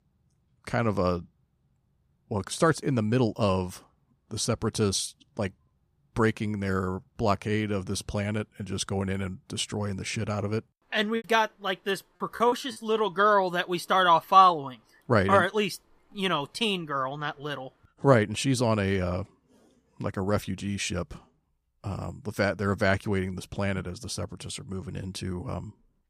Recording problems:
choppy; very; from 11 to 13 s; 18% of the speech affected

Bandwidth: 15 kHz